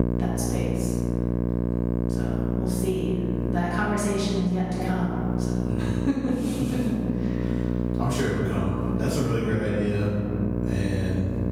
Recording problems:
room echo; strong; dies away in 1.8 s
off-mic speech; far
squashed, flat; somewhat
electrical hum; loud; throughout; 60 Hz, 3 dB below the speech

